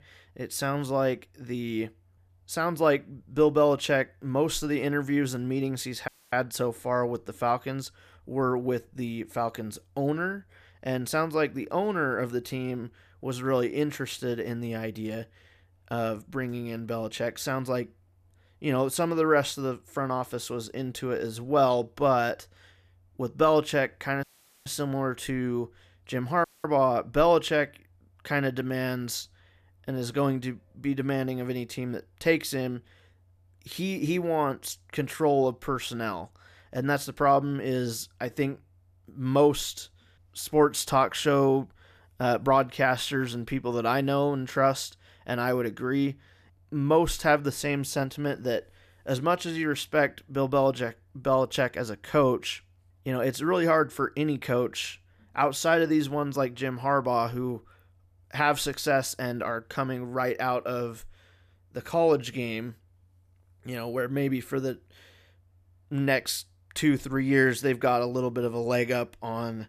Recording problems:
audio cutting out; at 6 s, at 24 s and at 26 s

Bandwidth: 14.5 kHz